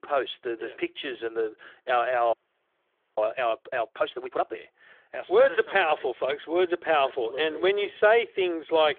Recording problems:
phone-call audio; nothing above 3.5 kHz
audio freezing; at 2.5 s for 1 s

